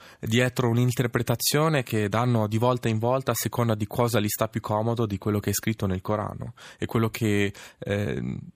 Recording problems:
none

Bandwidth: 15 kHz